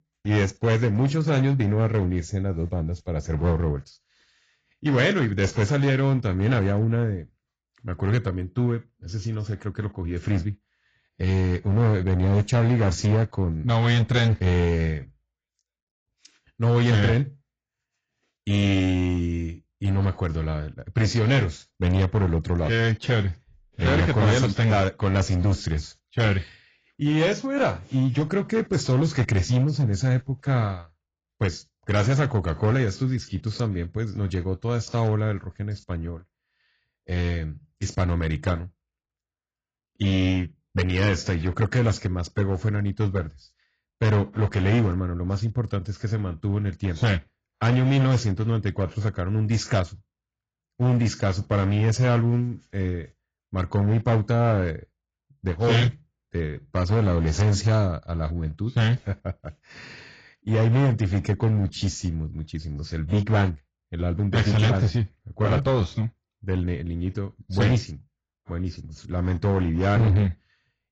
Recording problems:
garbled, watery; badly; nothing above 7.5 kHz
distortion; slight; 7% of the sound clipped

